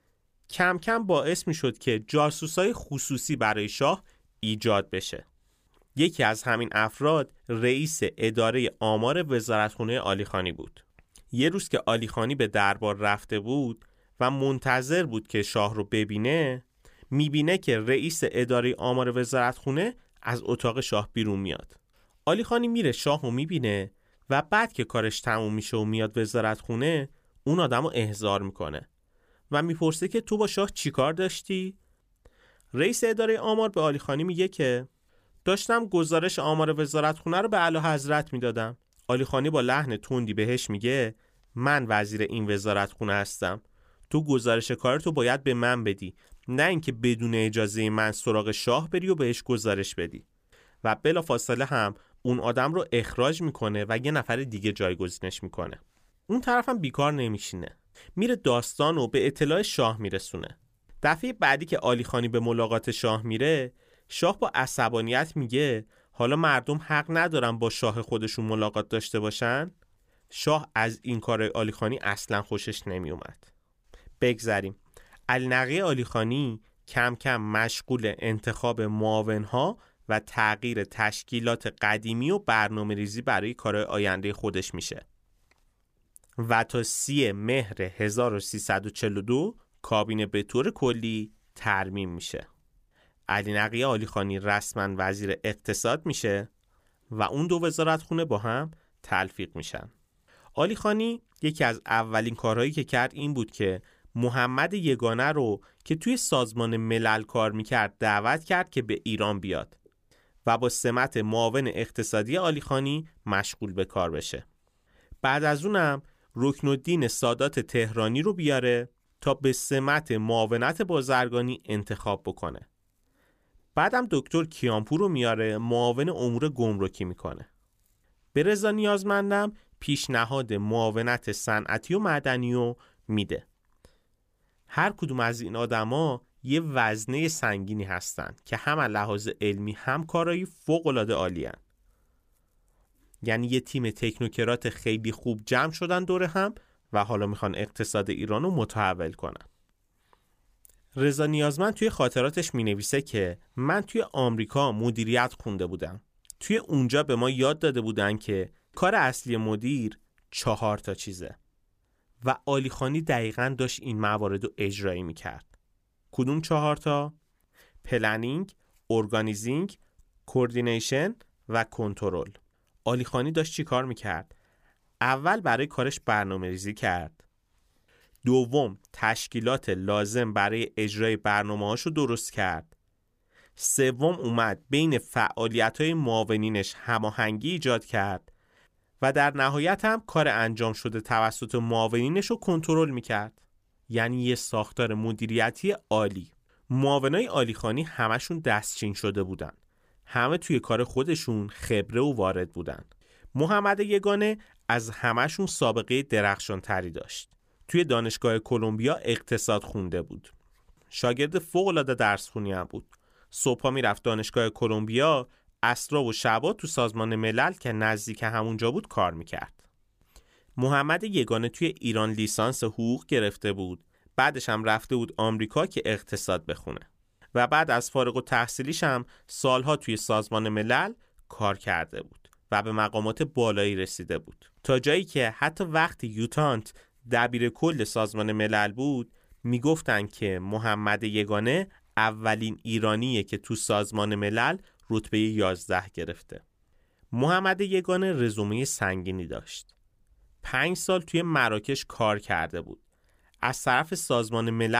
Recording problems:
abrupt cut into speech; at the end

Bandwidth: 15 kHz